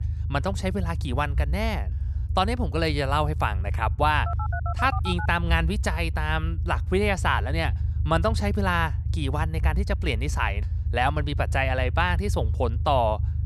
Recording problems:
low rumble; noticeable; throughout; 20 dB below the speech
phone ringing; noticeable; from 4.5 to 5.5 s; peak 7 dB below the speech

